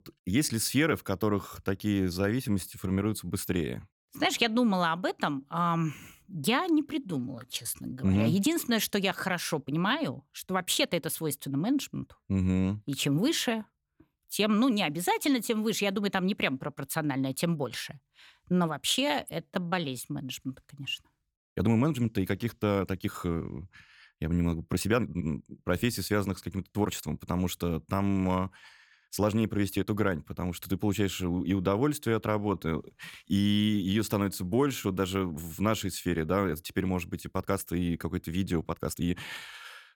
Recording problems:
uneven, jittery; strongly; from 2 to 39 s

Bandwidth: 17.5 kHz